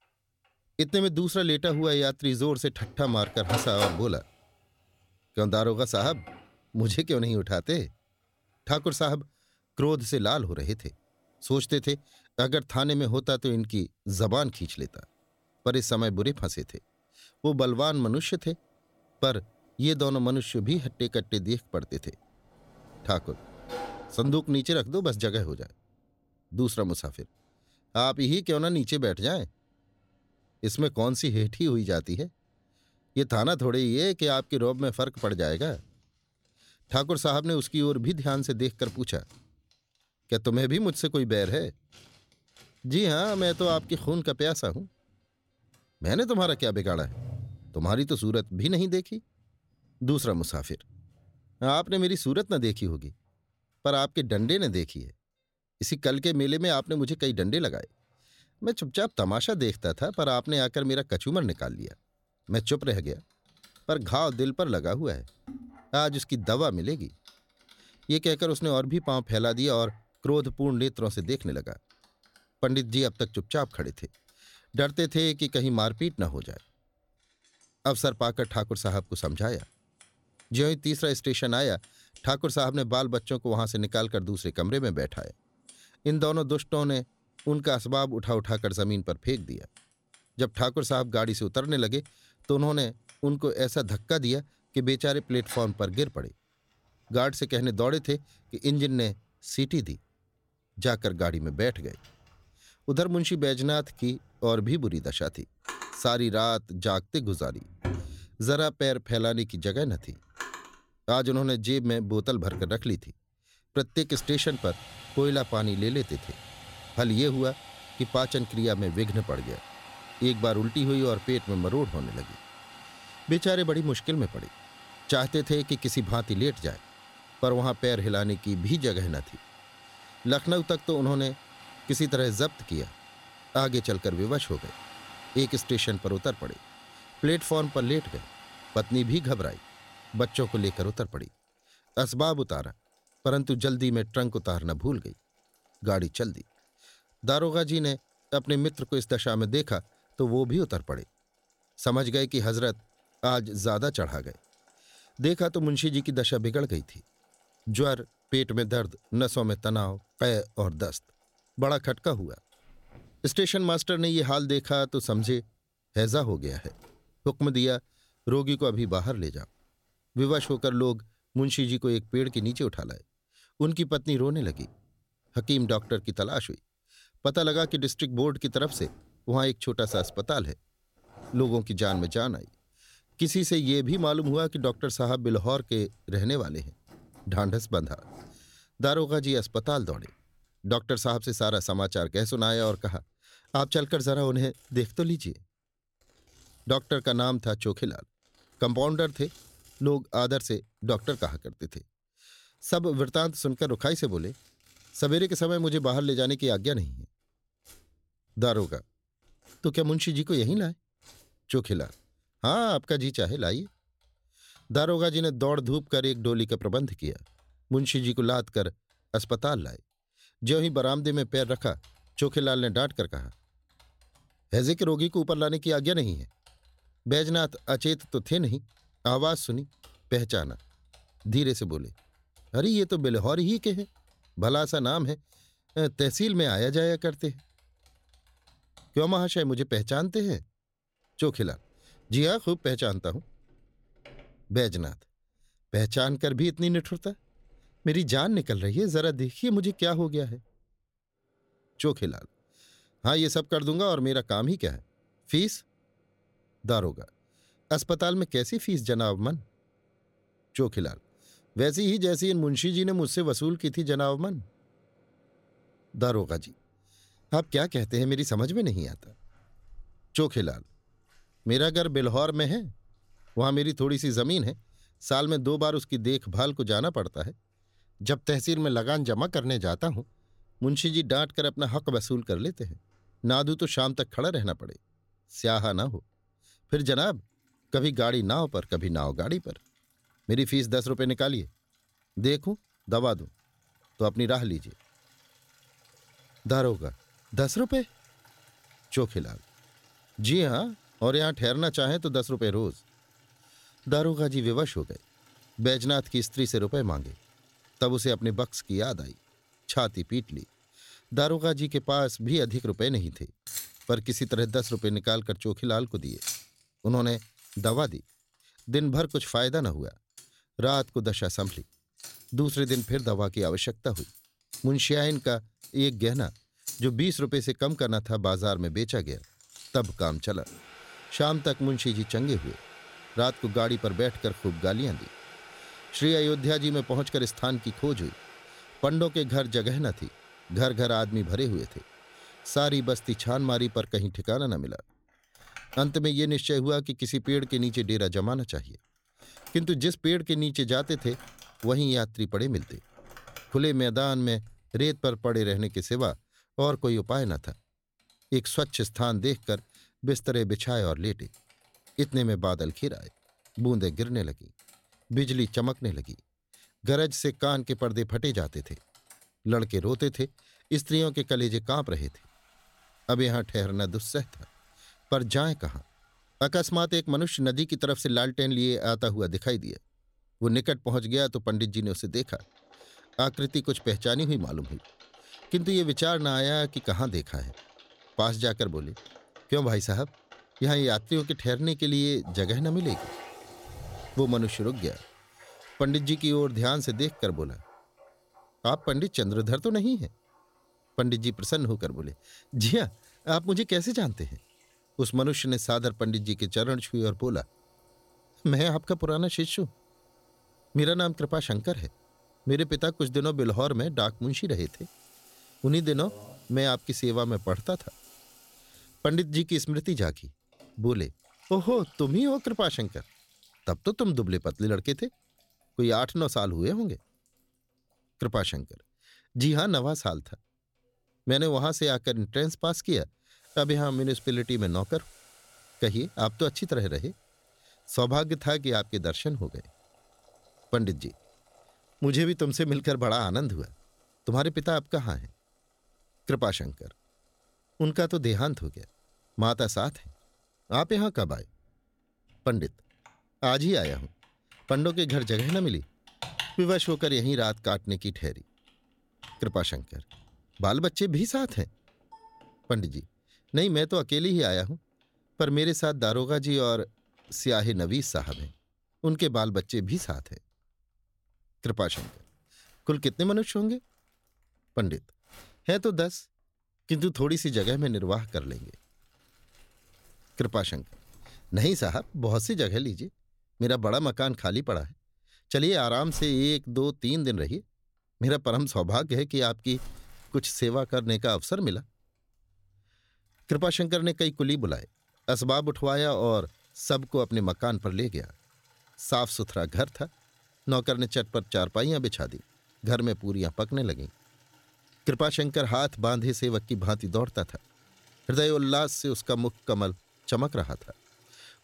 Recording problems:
household noises; noticeable; throughout; 20 dB below the speech

